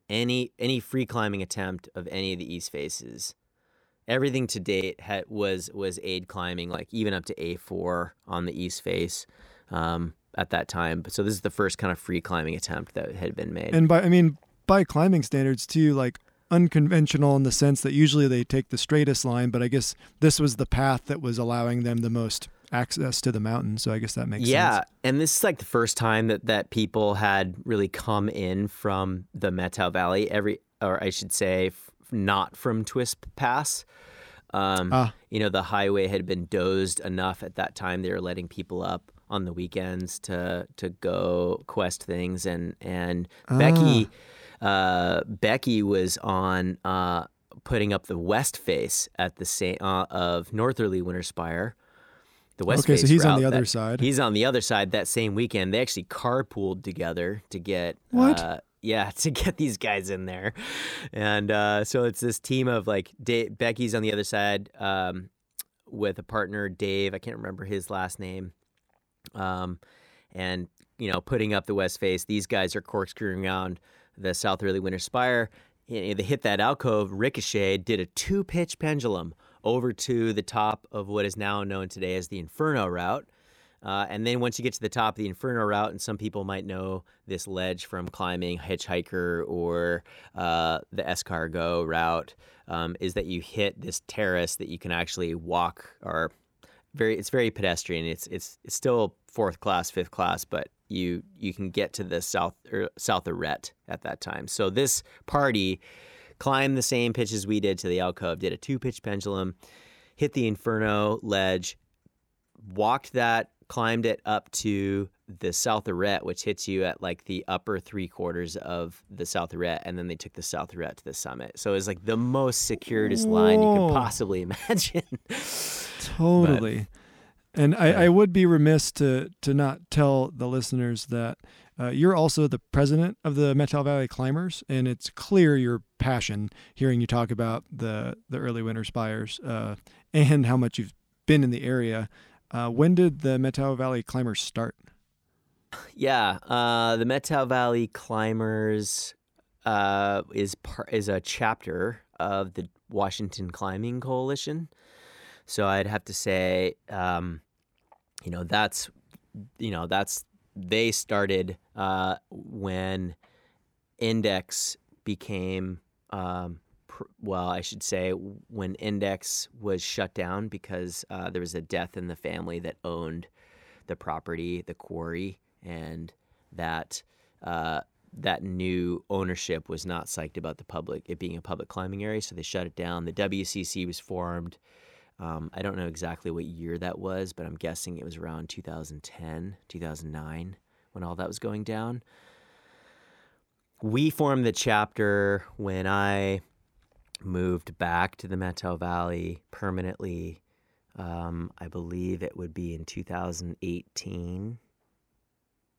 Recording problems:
none

